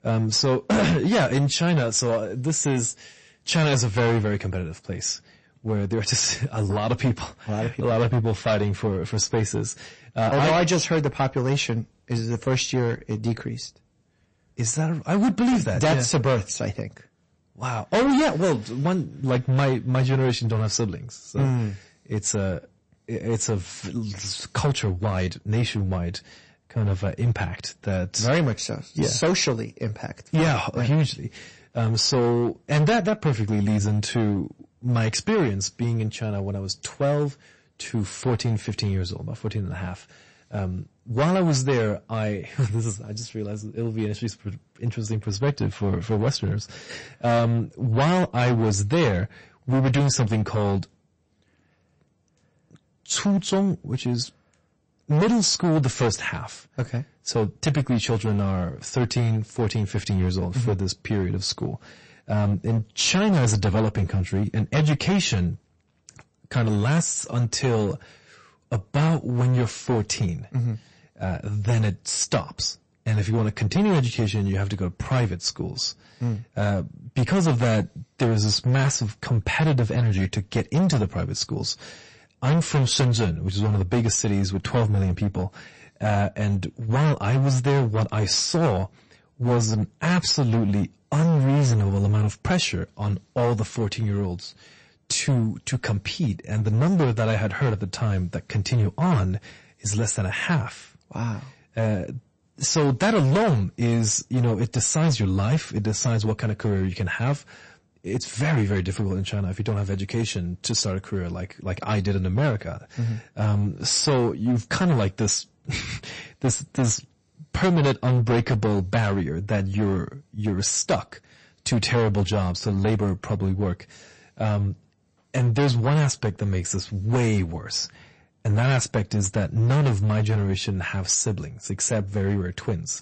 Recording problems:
distortion; heavy; 11% of the sound clipped
garbled, watery; slightly; nothing above 8 kHz

